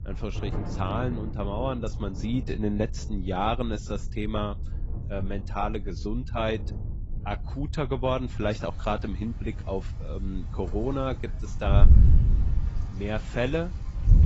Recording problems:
garbled, watery; badly; nothing above 7.5 kHz
rain or running water; loud; throughout; 10 dB below the speech
wind noise on the microphone; occasional gusts; 15 dB below the speech

